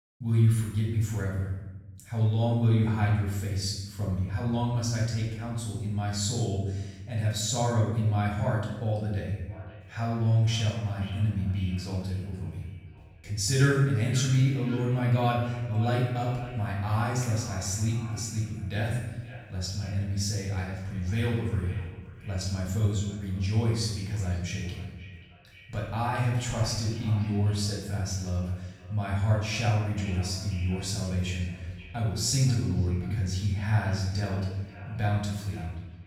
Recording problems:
off-mic speech; far
room echo; noticeable; dies away in 1 s
echo of what is said; faint; from 9.5 s on; 530 ms later, 20 dB below the speech

